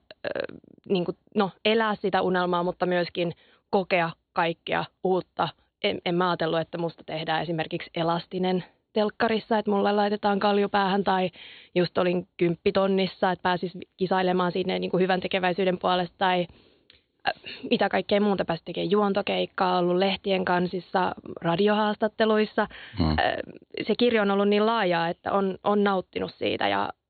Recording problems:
high frequencies cut off; severe; nothing above 4.5 kHz

